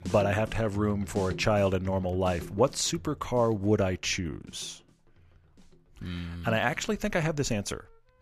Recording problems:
background music; noticeable; throughout; 15 dB below the speech

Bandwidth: 14.5 kHz